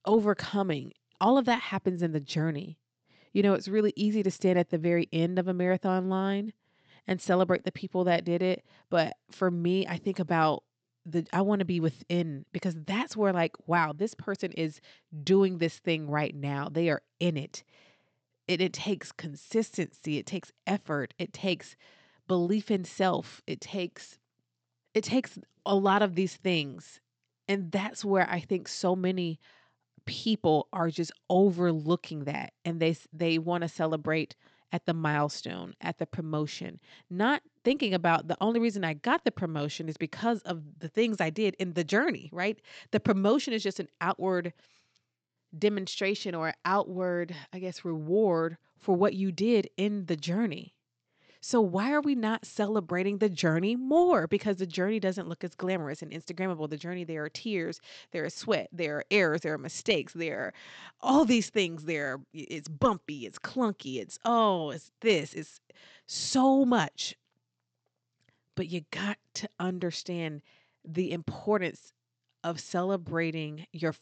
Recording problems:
high frequencies cut off; noticeable; nothing above 8 kHz

